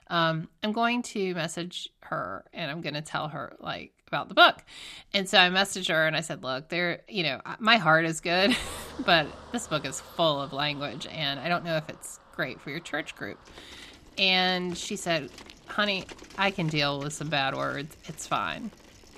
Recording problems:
traffic noise; faint; from 9 s on; 20 dB below the speech

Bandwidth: 14 kHz